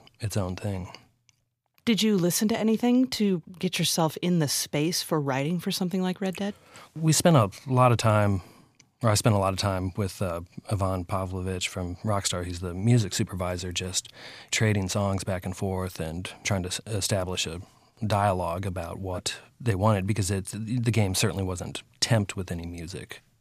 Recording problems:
none

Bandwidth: 15 kHz